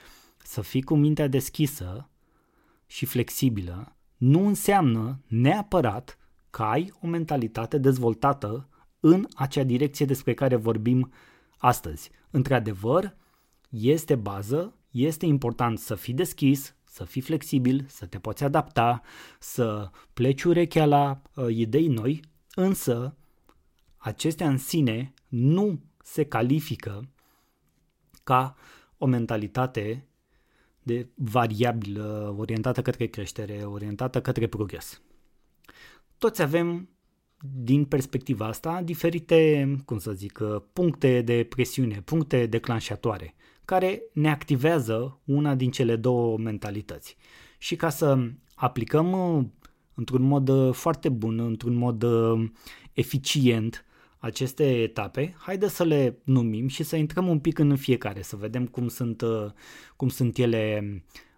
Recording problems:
none

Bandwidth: 16 kHz